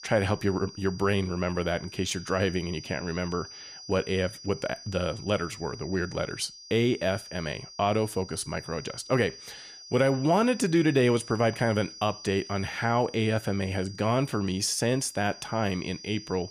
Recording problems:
high-pitched whine; noticeable; throughout; 5 kHz, 15 dB below the speech

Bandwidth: 15 kHz